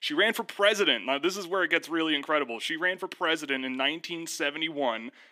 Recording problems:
thin; somewhat; fading below 250 Hz

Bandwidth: 15 kHz